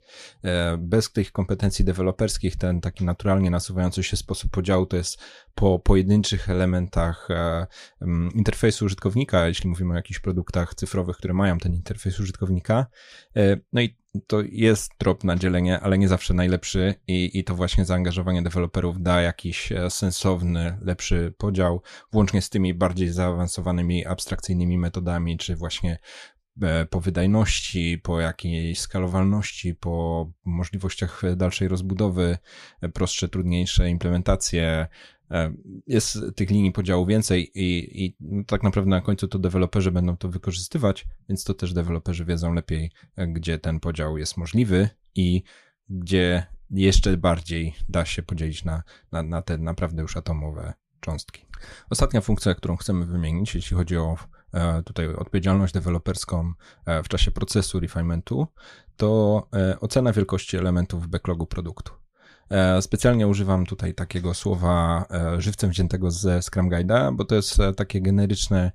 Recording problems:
none

